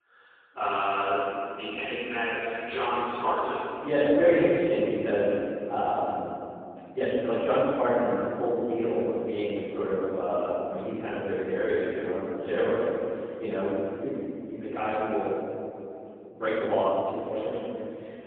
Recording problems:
phone-call audio; poor line
room echo; strong; dies away in 2.5 s
off-mic speech; far
uneven, jittery; strongly; from 2.5 to 17 s

